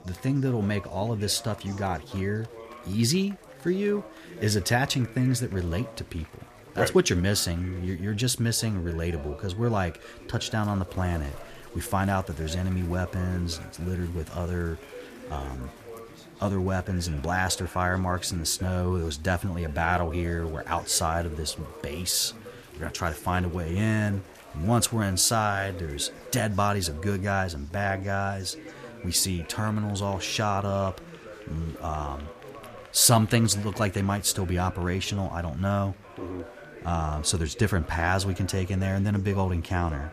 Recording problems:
chatter from many people; noticeable; throughout; 20 dB below the speech

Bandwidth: 14.5 kHz